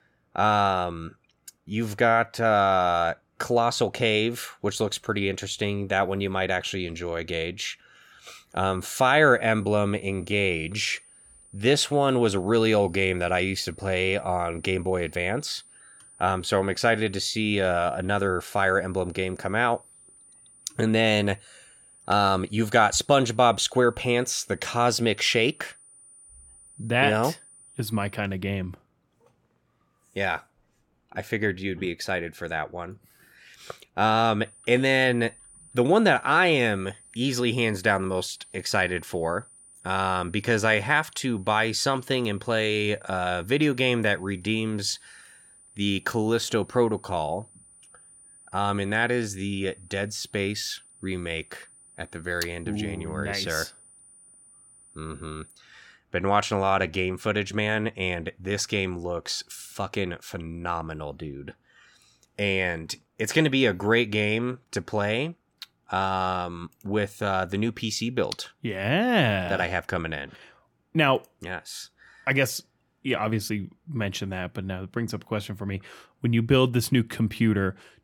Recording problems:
high-pitched whine; faint; from 8.5 to 28 s and from 34 to 56 s; 9.5 kHz, 25 dB below the speech

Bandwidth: 17.5 kHz